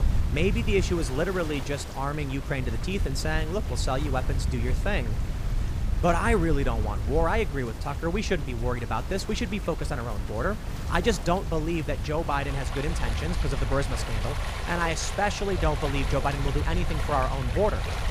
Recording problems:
rain or running water; noticeable; throughout; 10 dB below the speech
wind noise on the microphone; occasional gusts; 20 dB below the speech

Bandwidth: 15 kHz